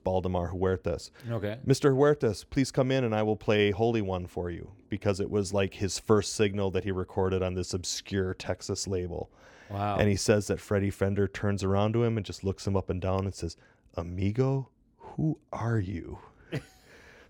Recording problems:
none

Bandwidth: 18 kHz